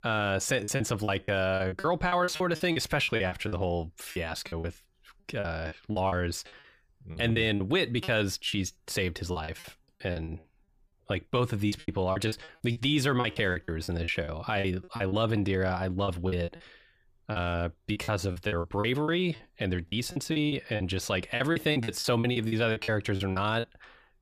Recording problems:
choppy; very; 16% of the speech affected

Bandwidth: 15 kHz